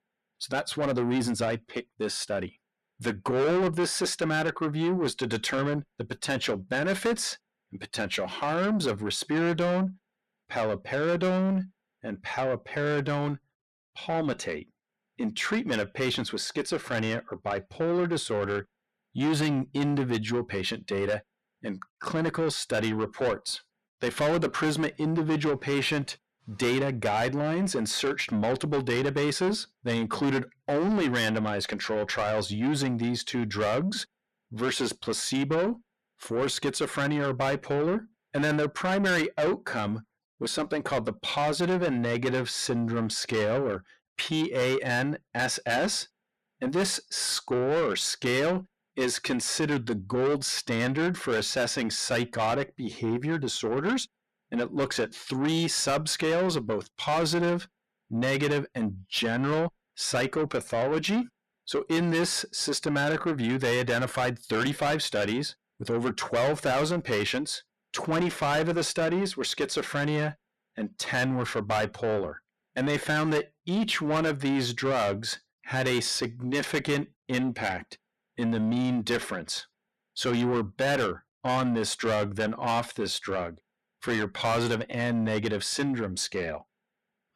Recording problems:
distortion; heavy; 7 dB below the speech

